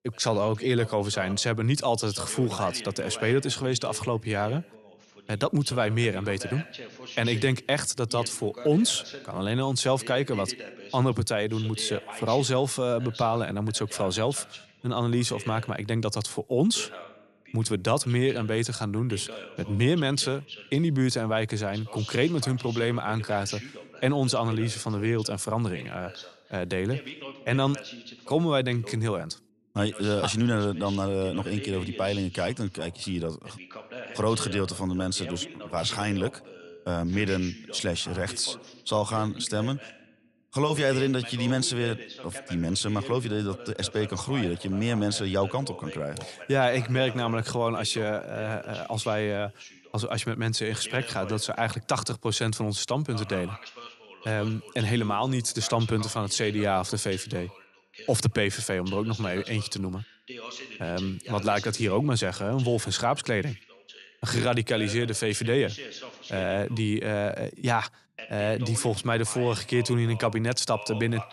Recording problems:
voice in the background; noticeable; throughout; 15 dB below the speech

